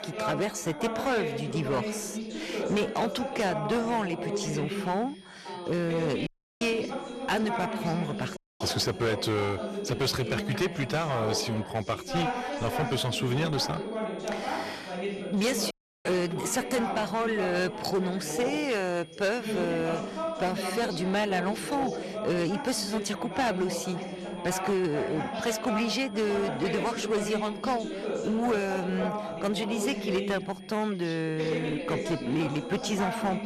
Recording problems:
distortion; slight; 8% of the sound clipped
background chatter; loud; throughout; 3 voices, 4 dB below the speech
high-pitched whine; faint; throughout; 3.5 kHz, 25 dB below the speech
audio cutting out; at 6.5 s, at 8.5 s and at 16 s

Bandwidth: 13.5 kHz